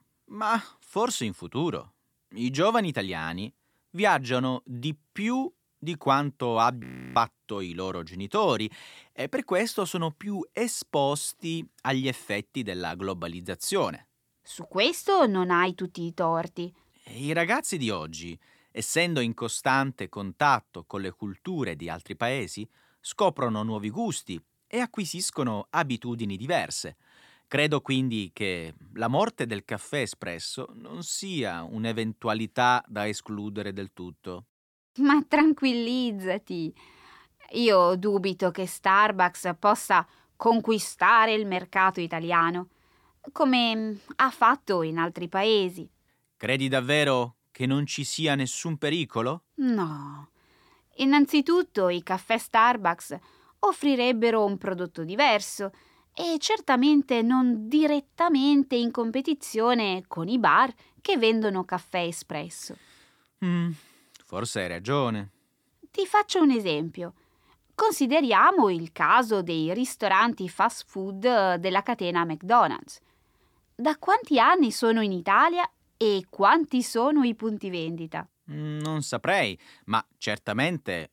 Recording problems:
audio freezing; at 7 s

